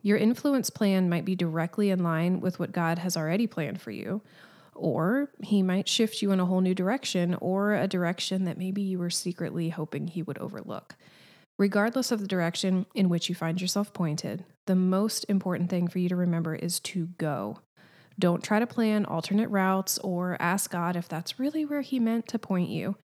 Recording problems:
none

